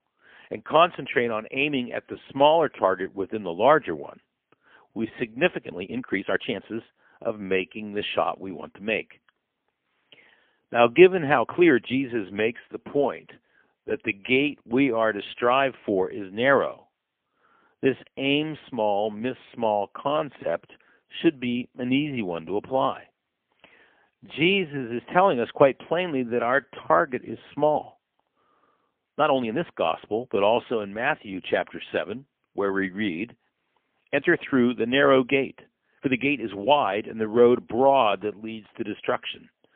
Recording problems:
phone-call audio; poor line; nothing above 3.5 kHz
uneven, jittery; strongly; from 1.5 to 38 s

